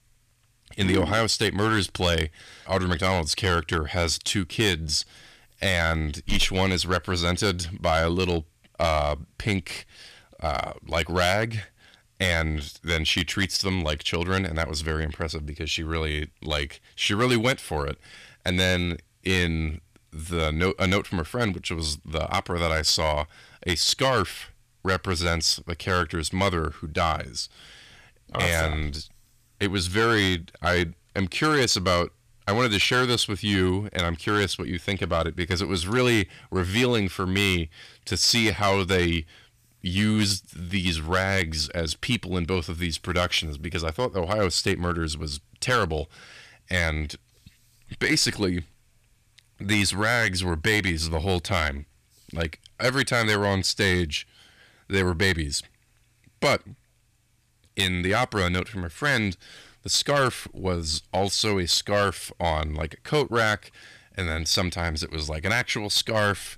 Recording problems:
distortion; slight; 2% of the sound clipped

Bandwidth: 14.5 kHz